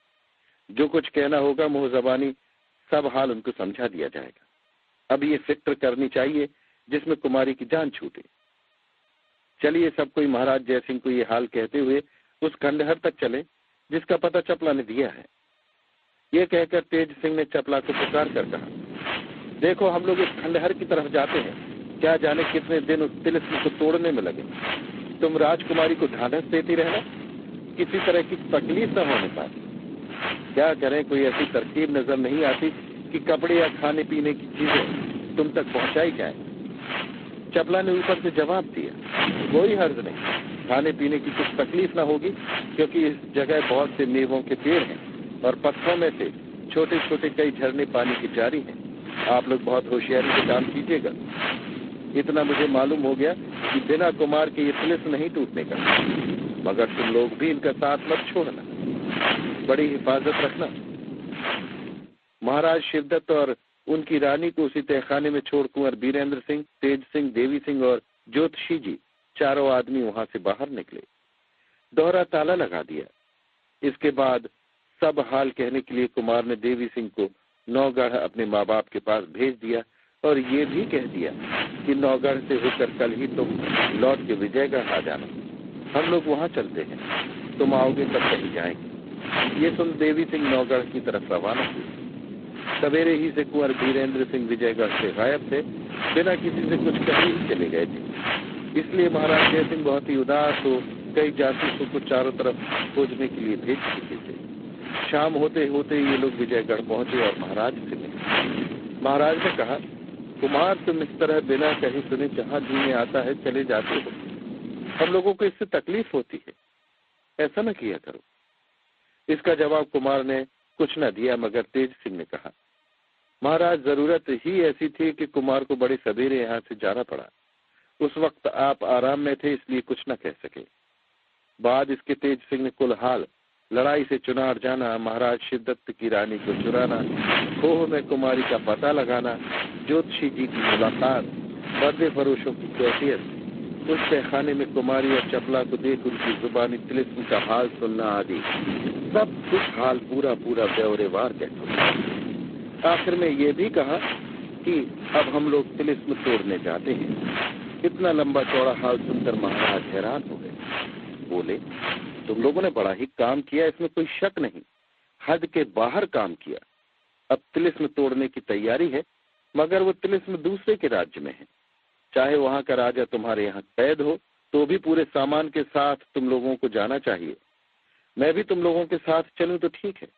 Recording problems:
phone-call audio; poor line; nothing above 4 kHz
garbled, watery; slightly
wind noise on the microphone; heavy; from 18 s to 1:02, from 1:21 to 1:55 and from 2:16 to 2:43; 4 dB below the speech

